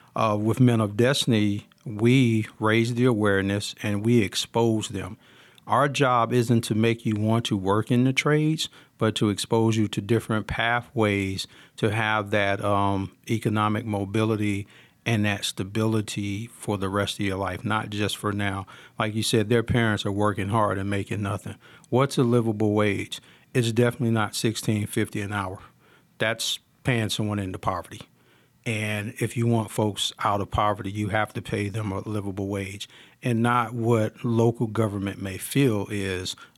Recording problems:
none

